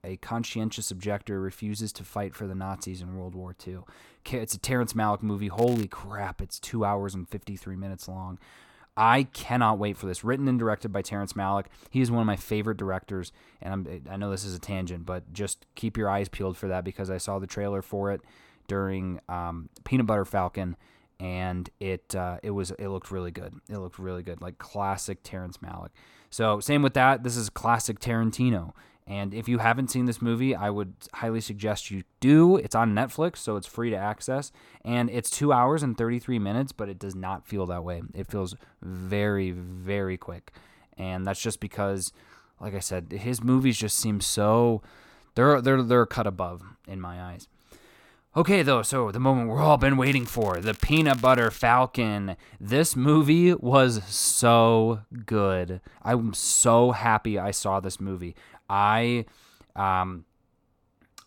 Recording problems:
crackling; noticeable; at 5.5 s and from 50 to 51 s; 20 dB below the speech

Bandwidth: 17.5 kHz